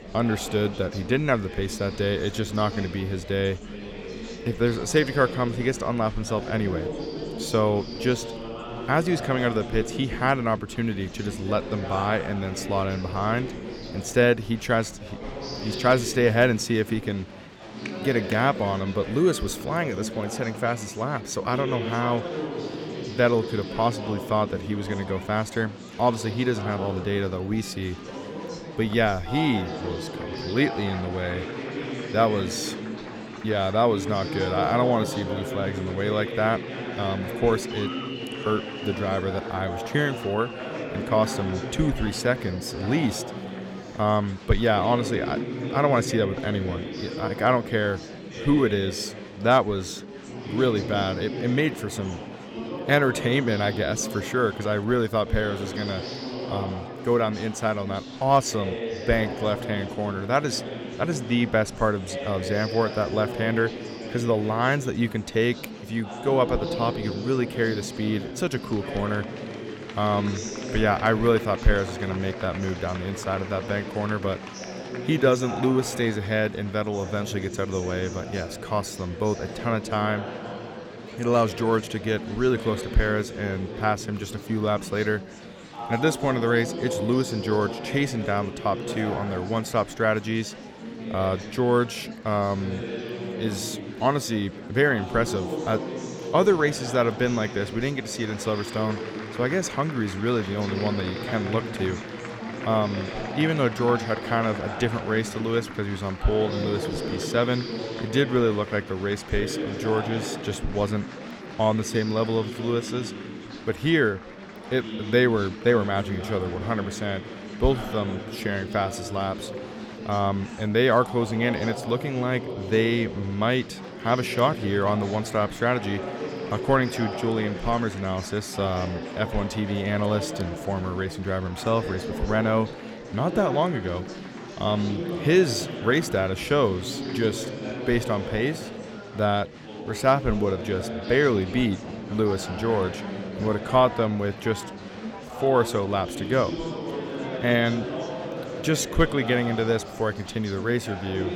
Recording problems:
chatter from many people; loud; throughout; 8 dB below the speech

